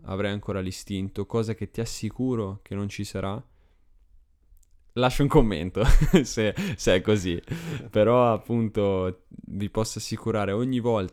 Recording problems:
none

